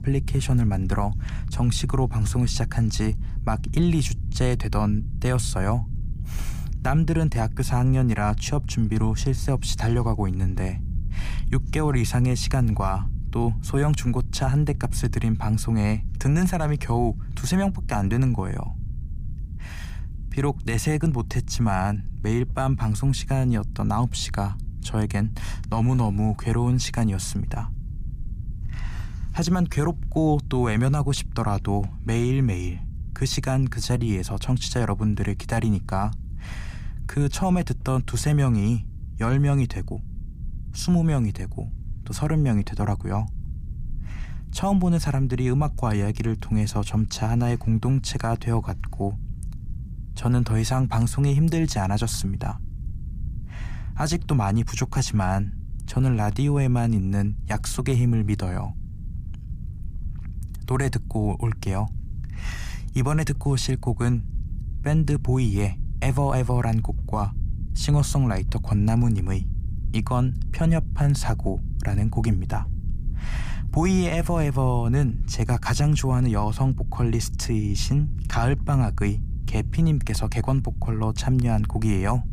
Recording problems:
low rumble; noticeable; throughout; 20 dB below the speech

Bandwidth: 15 kHz